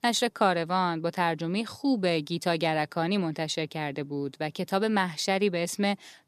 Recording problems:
none

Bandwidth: 14.5 kHz